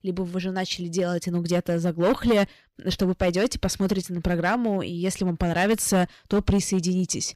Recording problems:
distortion; slight; 5% of the sound clipped

